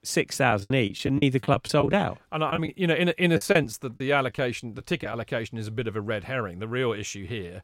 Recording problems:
choppy; very; from 0.5 to 2 s and from 2.5 to 5 s; 13% of the speech affected

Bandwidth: 16 kHz